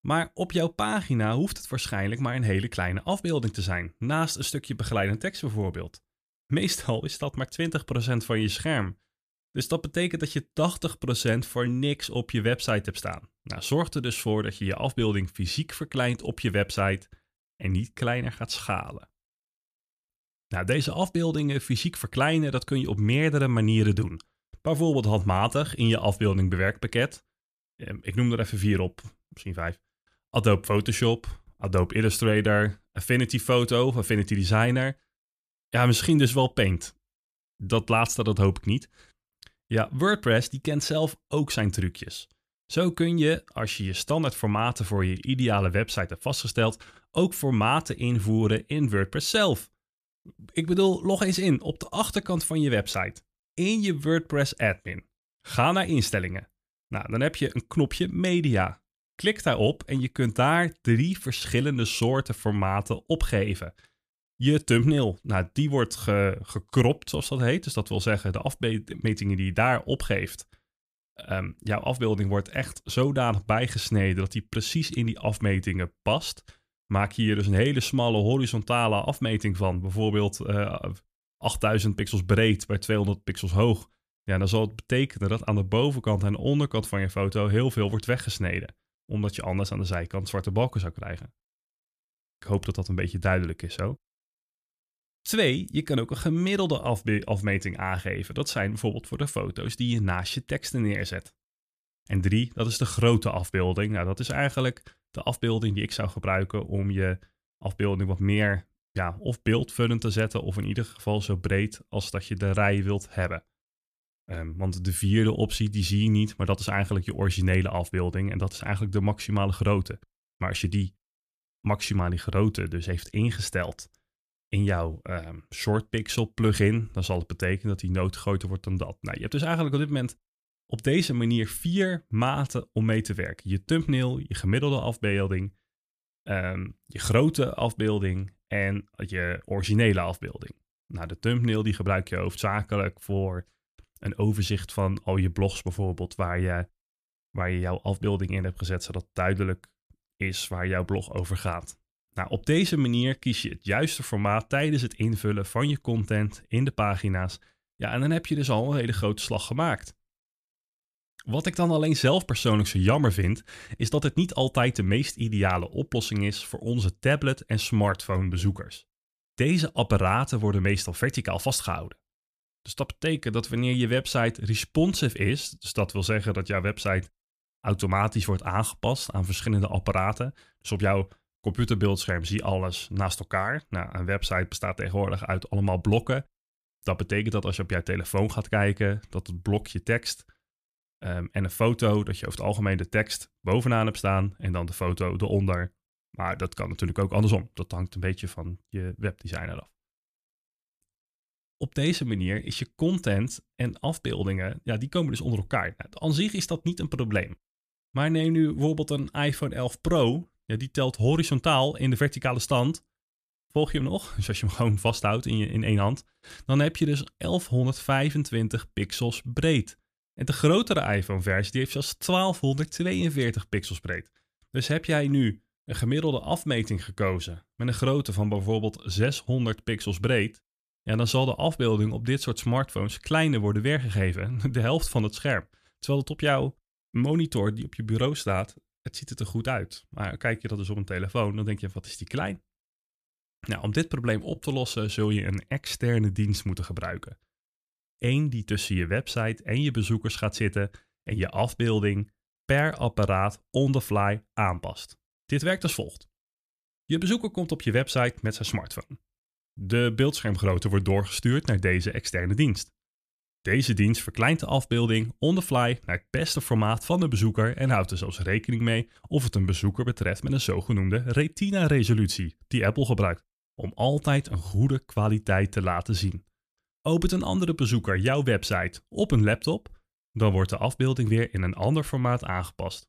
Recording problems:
none

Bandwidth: 14.5 kHz